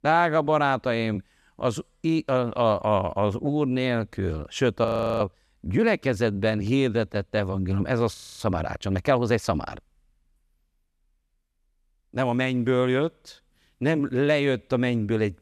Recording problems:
audio freezing; at 5 s and at 8 s

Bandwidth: 14.5 kHz